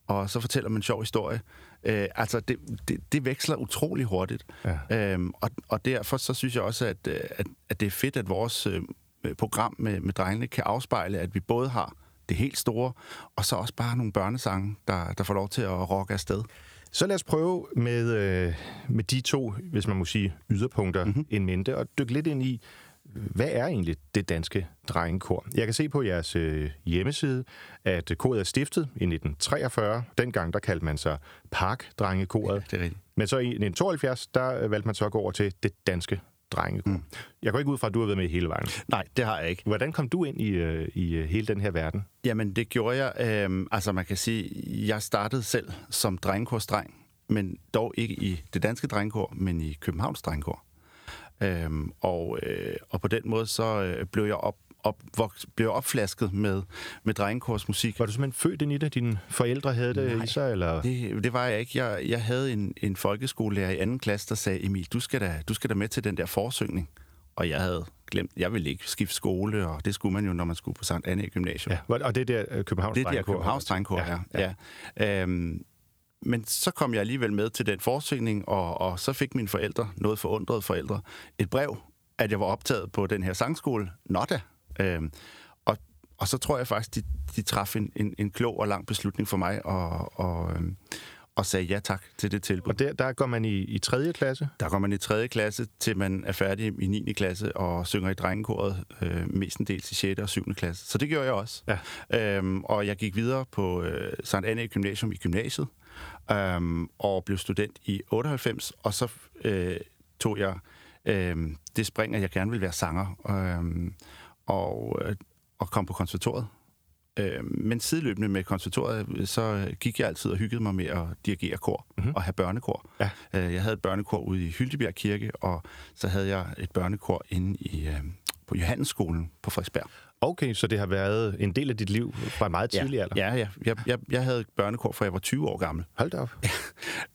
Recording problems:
squashed, flat; somewhat

